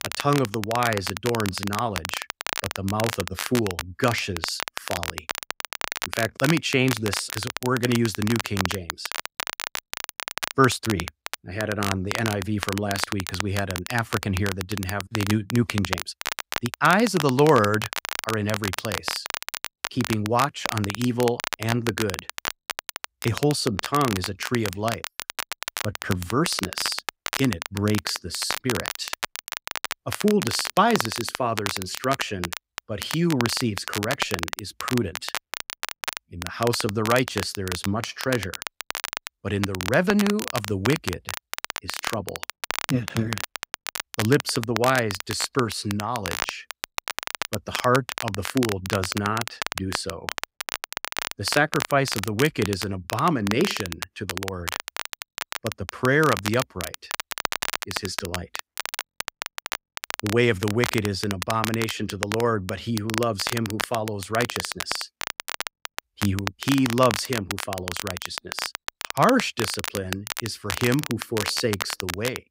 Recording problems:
crackle, like an old record; loud; 6 dB below the speech

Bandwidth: 15.5 kHz